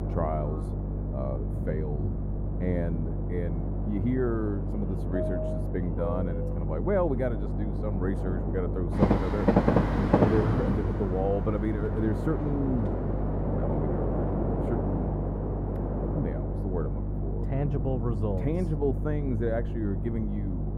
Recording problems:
muffled; very; fading above 2 kHz
electrical hum; loud; throughout; 50 Hz, 10 dB below the speech
train or aircraft noise; loud; throughout; 1 dB below the speech
wind noise on the microphone; occasional gusts; 15 dB below the speech

